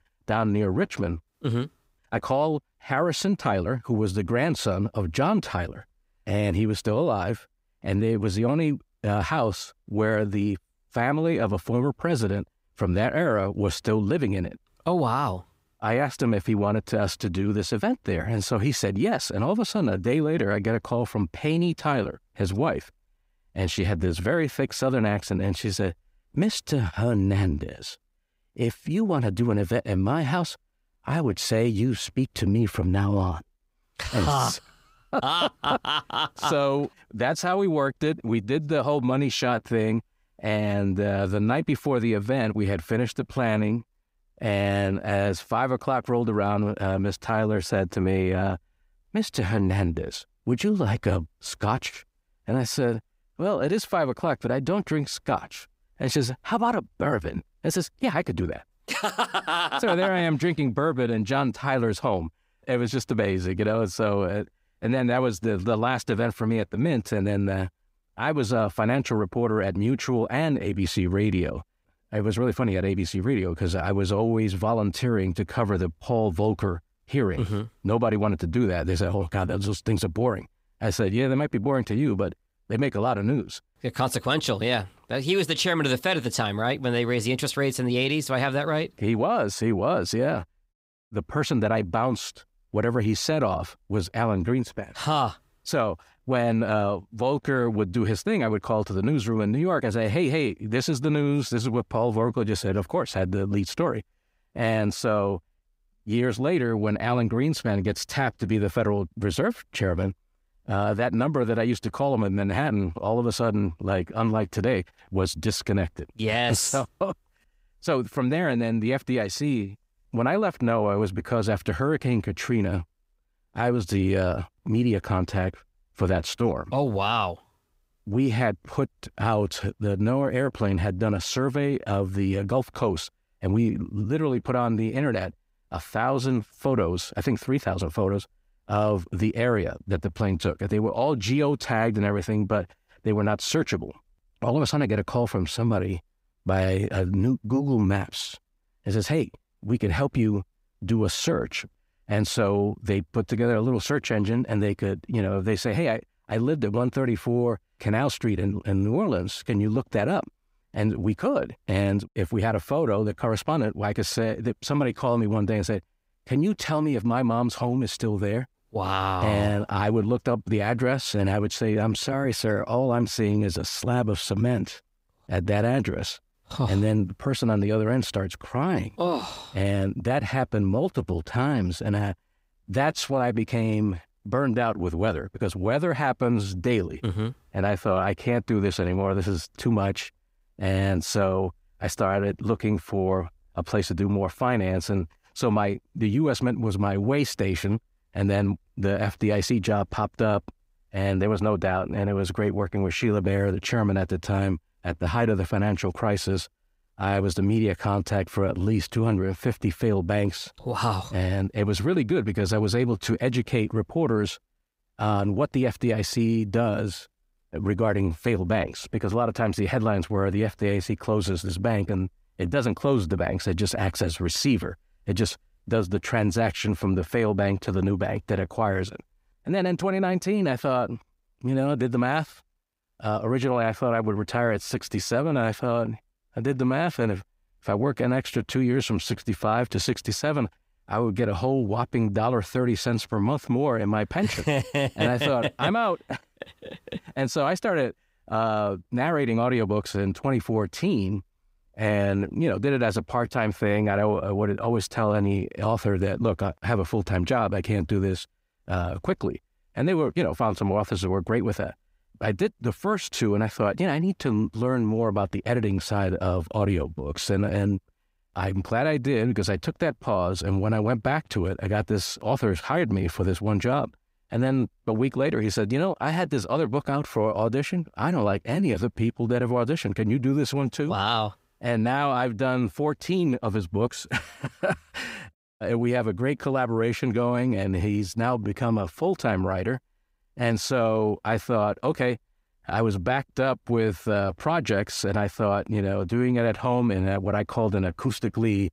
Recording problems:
none

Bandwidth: 15.5 kHz